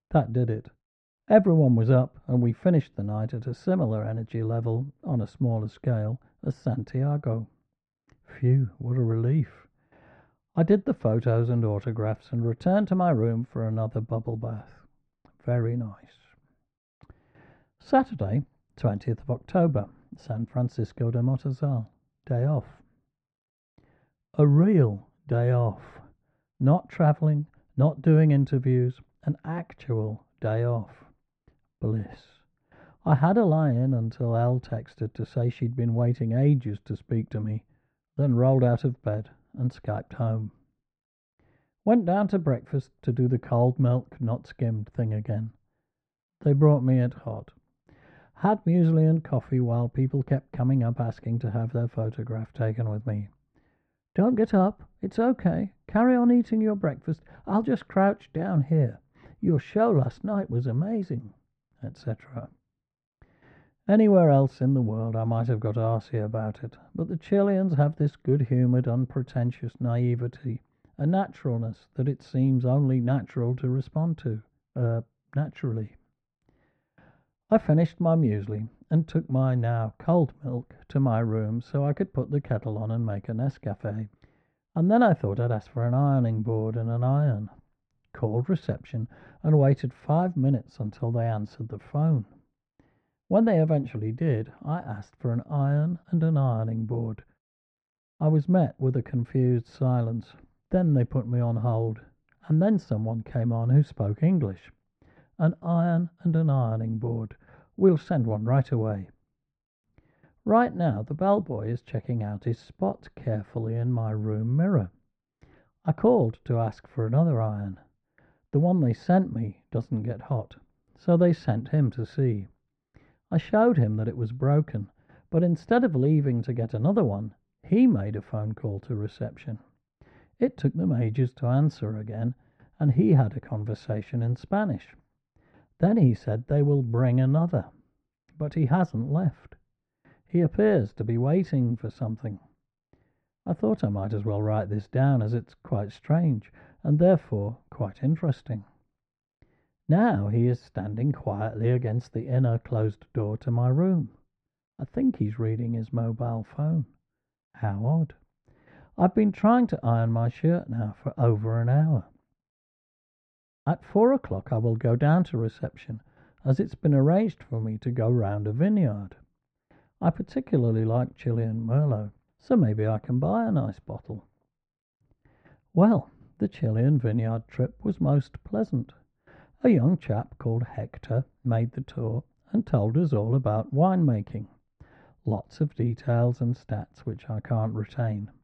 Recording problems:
muffled; very; fading above 1 kHz

